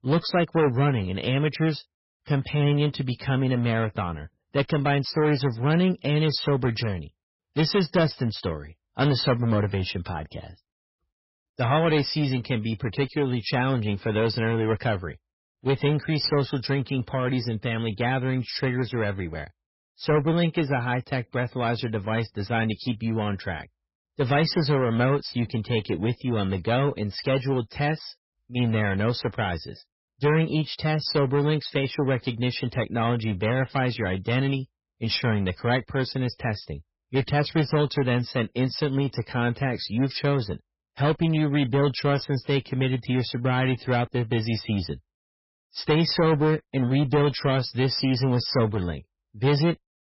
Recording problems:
garbled, watery; badly; nothing above 5.5 kHz
distortion; slight; 7% of the sound clipped

